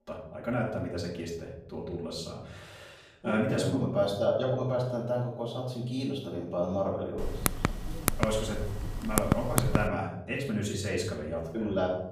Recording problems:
off-mic speech; far
room echo; noticeable; dies away in 1 s
keyboard typing; loud; from 7 to 10 s; peak 3 dB above the speech

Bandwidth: 15 kHz